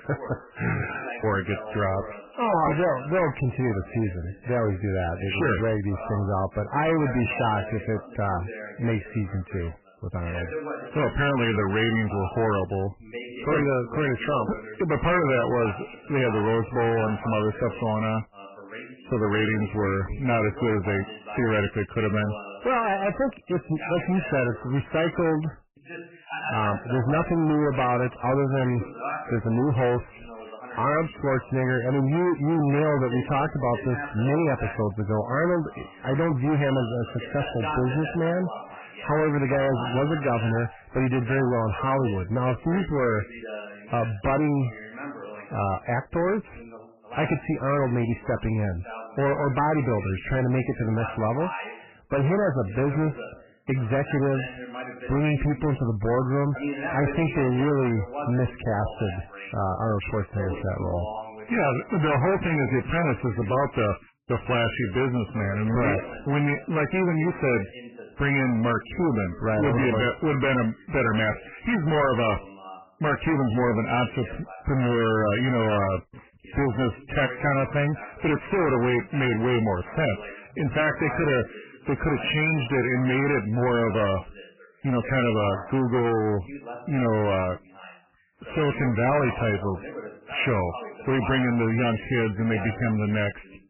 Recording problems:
distortion; heavy; 5 dB below the speech
garbled, watery; badly; nothing above 3 kHz
voice in the background; noticeable; throughout; 15 dB below the speech

